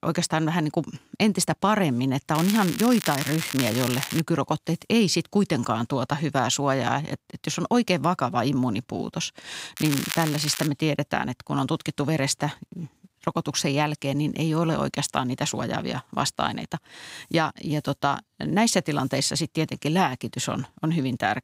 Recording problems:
crackling; loud; from 2.5 to 4 s and at 10 s; 6 dB below the speech

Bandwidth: 15.5 kHz